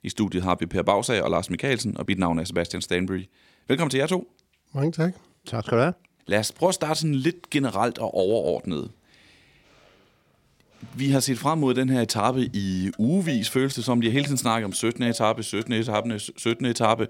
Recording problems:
traffic noise; faint; from 7 s on; 20 dB below the speech

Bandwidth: 16.5 kHz